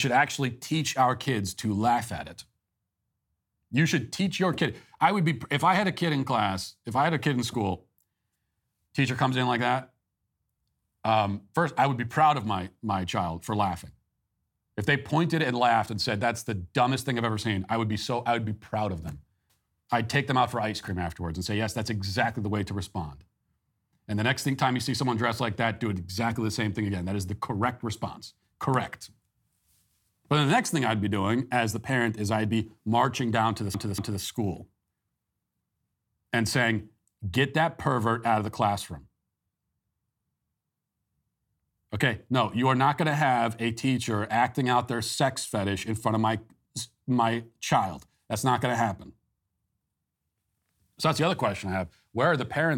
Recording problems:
abrupt cut into speech; at the start and the end
audio stuttering; at 34 s

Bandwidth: 17.5 kHz